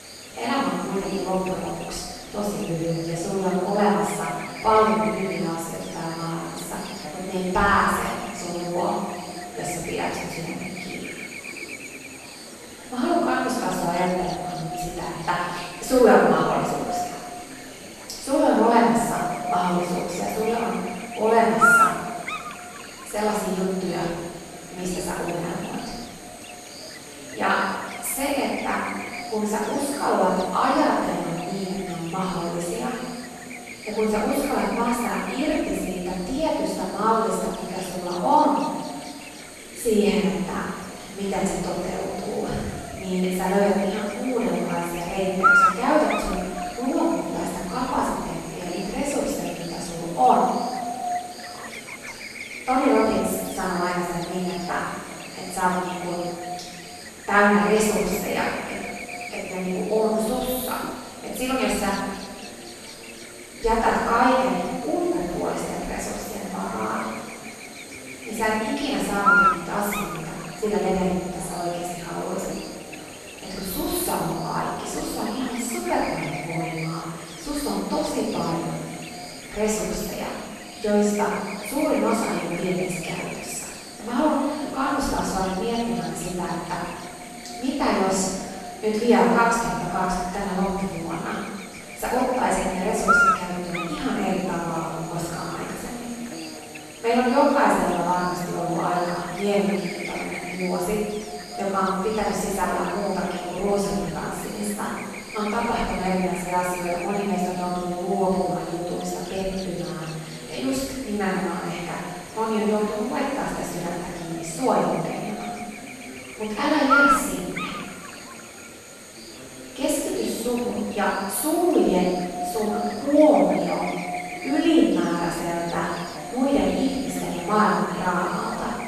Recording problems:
room echo; strong; dies away in 1.1 s
off-mic speech; far
echo of what is said; noticeable; throughout; 250 ms later, 15 dB below the speech
electrical hum; loud; throughout; 60 Hz, 6 dB below the speech
chatter from many people; faint; throughout; 20 dB below the speech

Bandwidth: 13.5 kHz